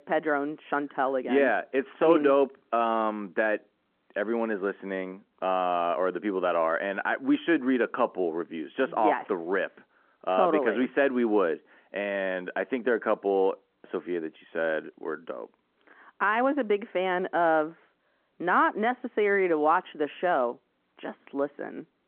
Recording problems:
muffled; very; fading above 1.5 kHz
phone-call audio

